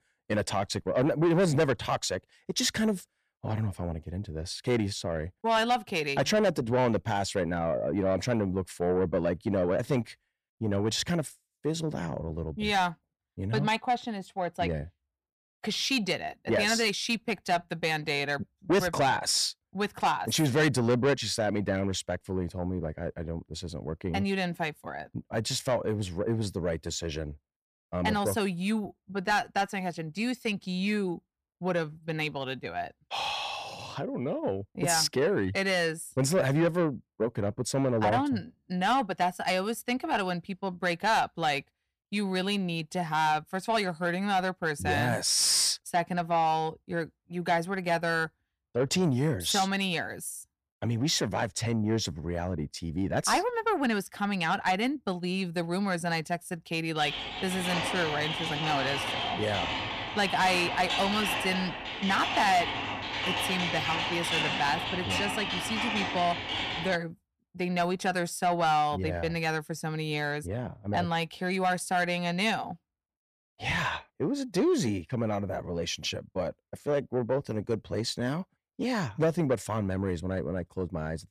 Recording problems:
distortion; slight; 10 dB below the speech
keyboard typing; loud; from 57 s to 1:07; peak 2 dB above the speech

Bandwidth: 14.5 kHz